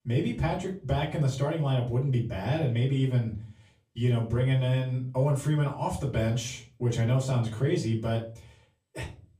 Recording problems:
off-mic speech; far
room echo; slight; dies away in 0.3 s

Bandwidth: 14.5 kHz